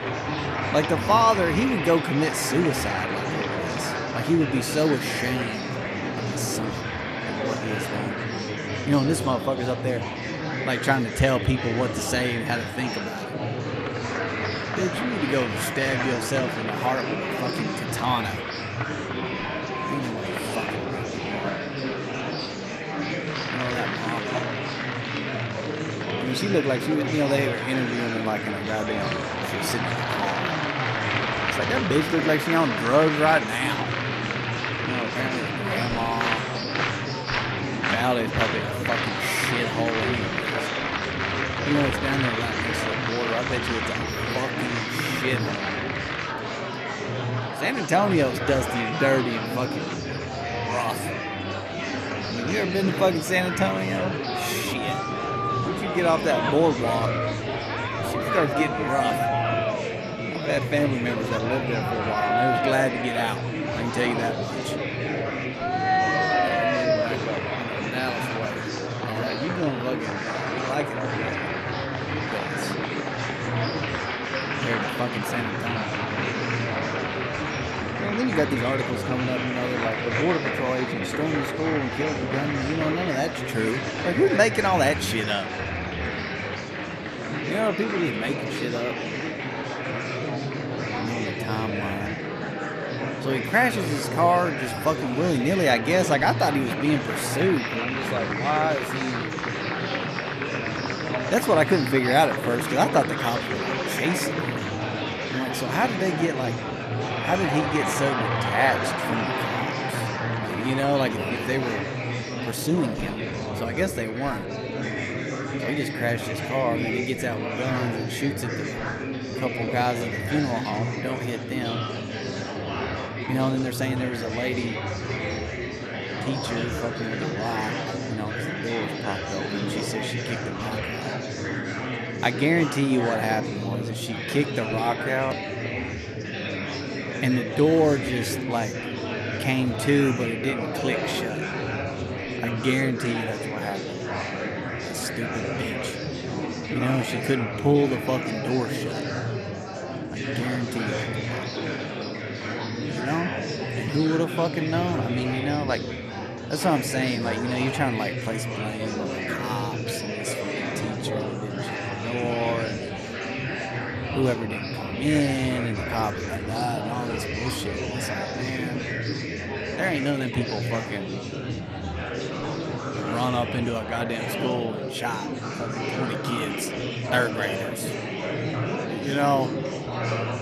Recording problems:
murmuring crowd; loud; throughout; 1 dB below the speech
uneven, jittery; strongly; from 16 s to 2:57

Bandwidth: 13.5 kHz